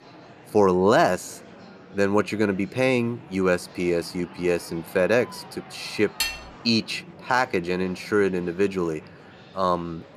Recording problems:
murmuring crowd; faint; throughout; 20 dB below the speech
clattering dishes; noticeable; at 6 s; peak 3 dB below the speech

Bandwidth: 14.5 kHz